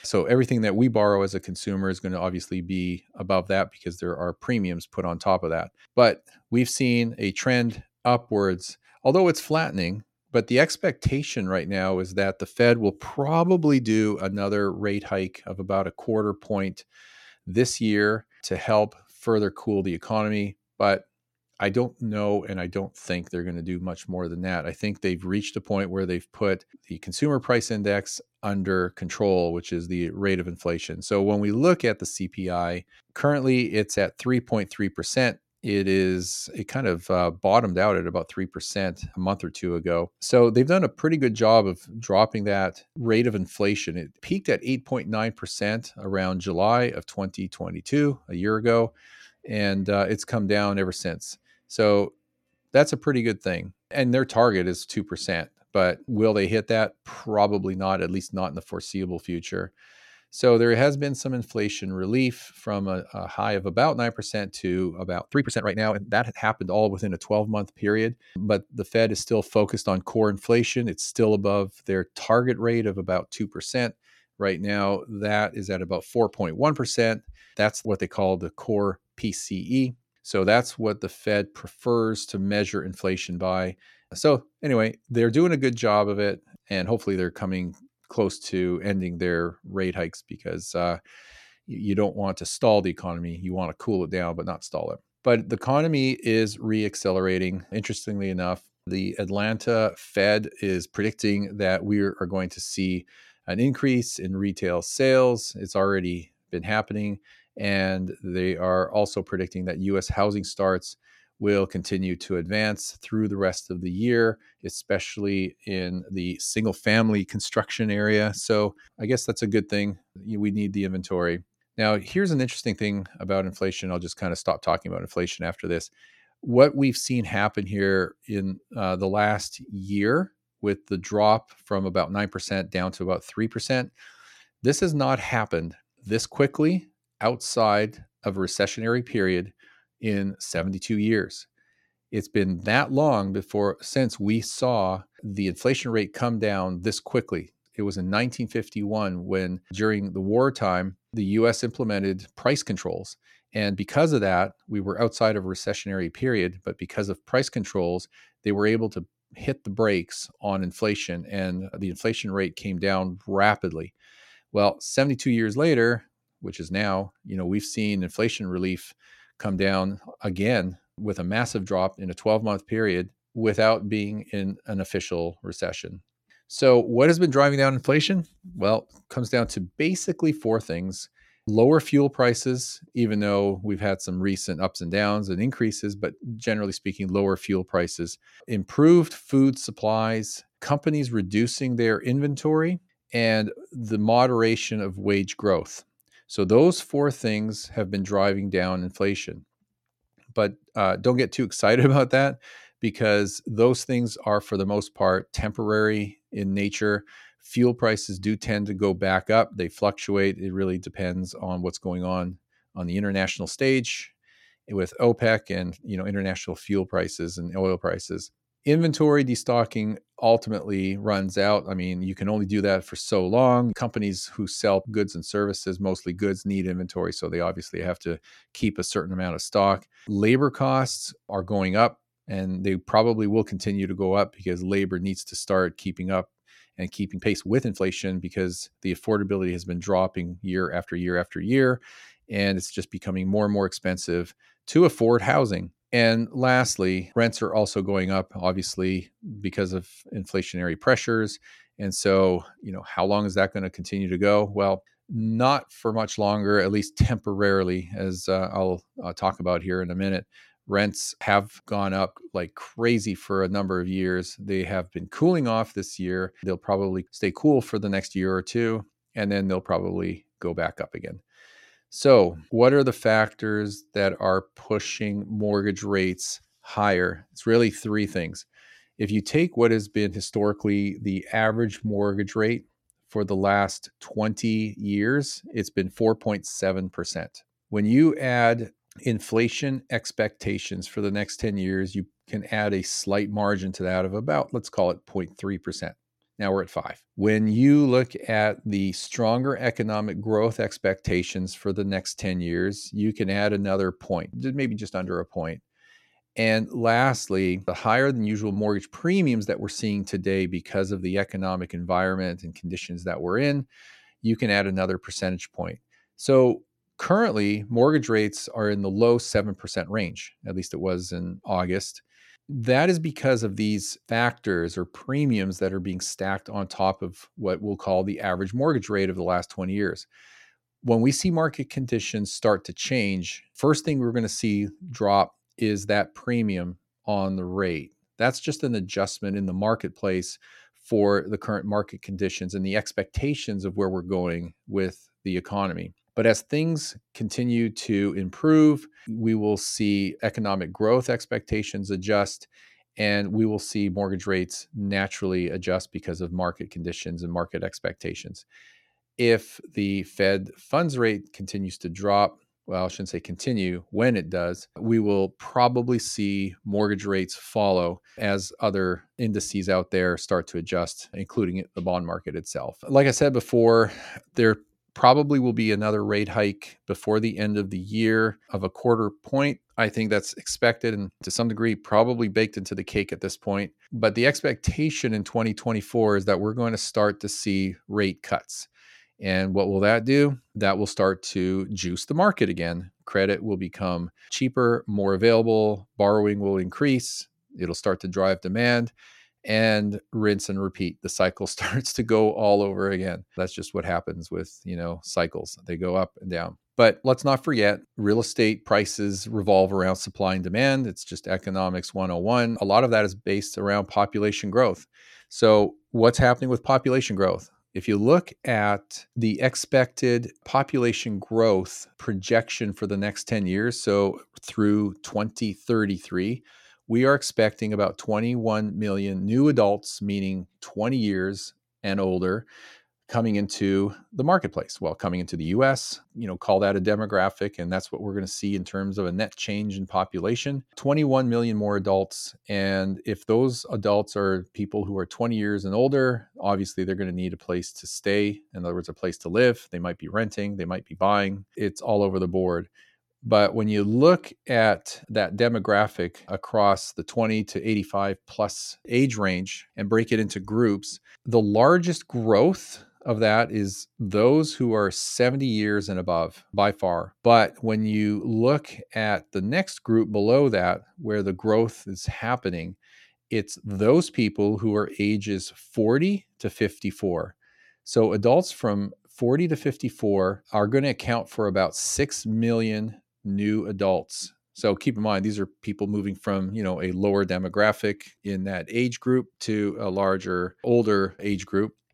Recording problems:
uneven, jittery; strongly; from 8 s to 8:04

